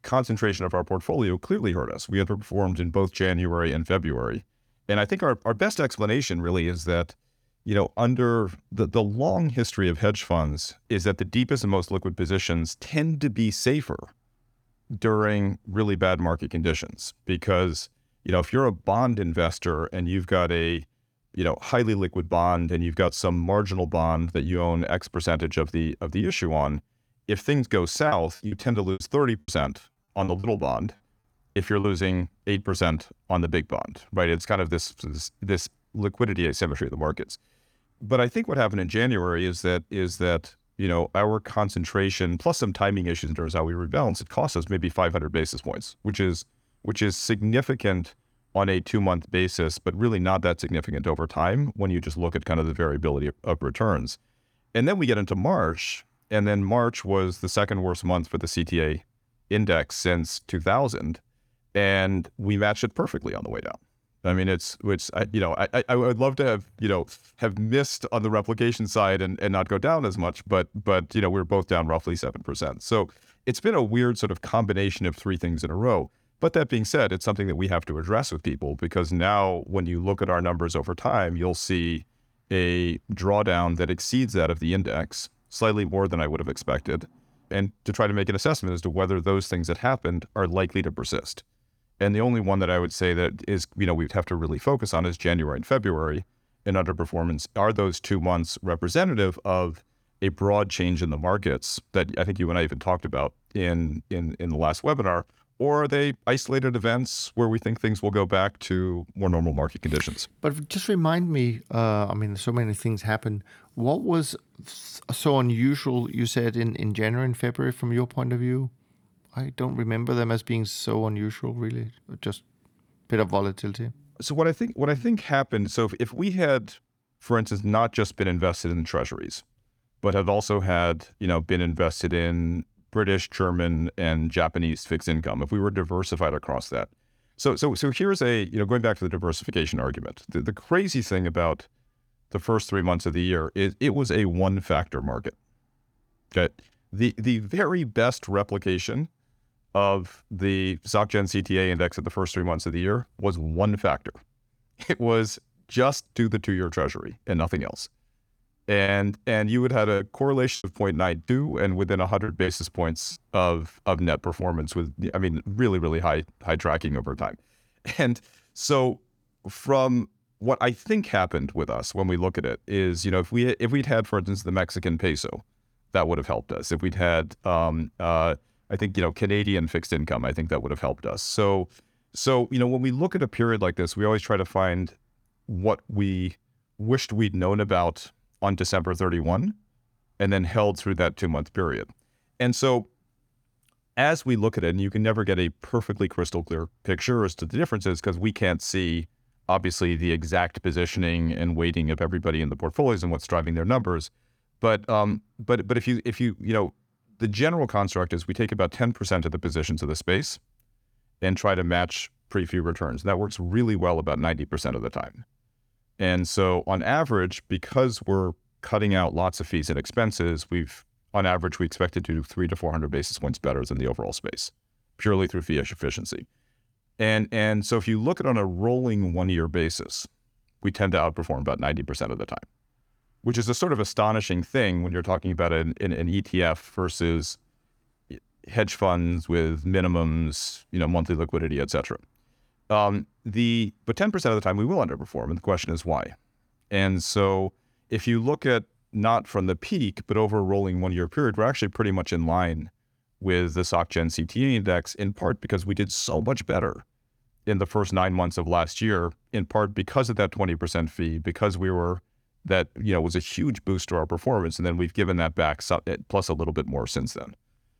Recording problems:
choppy; very; from 28 to 32 s and from 2:39 to 2:43; 10% of the speech affected

